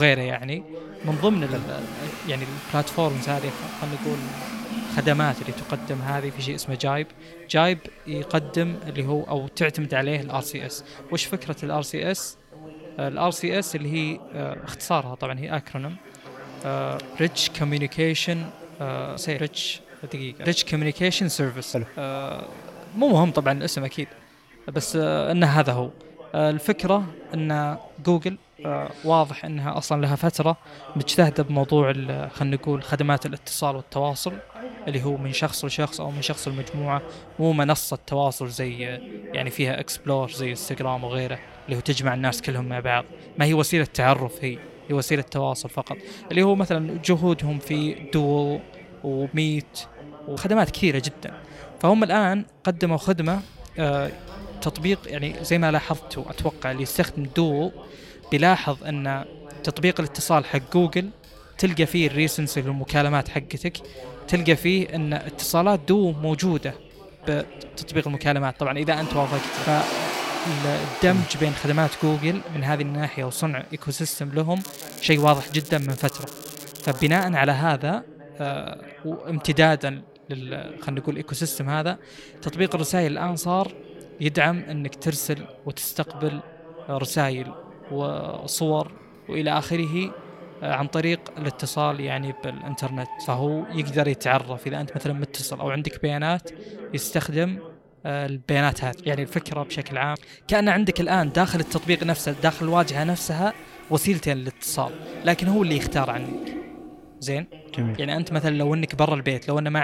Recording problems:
household noises; noticeable; throughout; 15 dB below the speech
background chatter; noticeable; throughout; 2 voices, 20 dB below the speech
crackling; noticeable; from 1:15 to 1:17; 15 dB below the speech
abrupt cut into speech; at the start and the end

